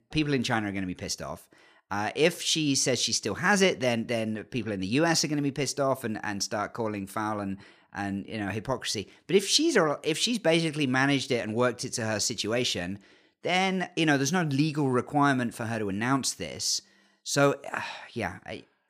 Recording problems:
none

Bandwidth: 15 kHz